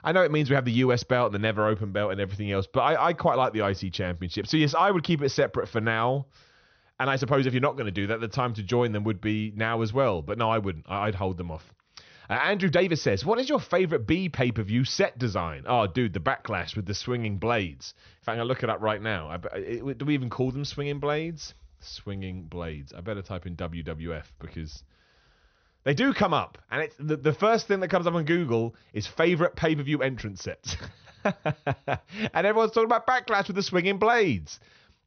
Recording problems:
high frequencies cut off; noticeable; nothing above 6 kHz
uneven, jittery; slightly; from 7 to 26 s

